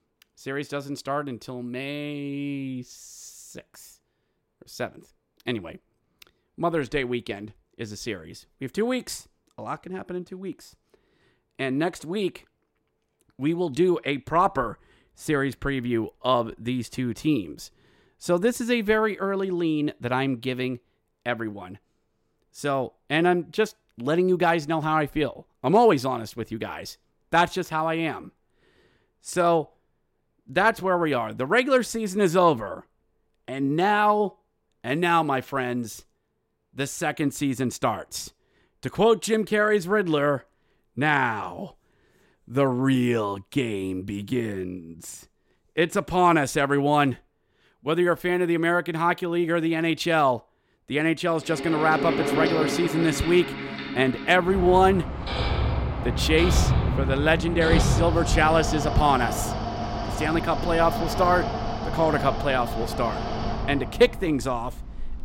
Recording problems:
machinery noise; loud; from 52 s on; 4 dB below the speech

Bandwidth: 16 kHz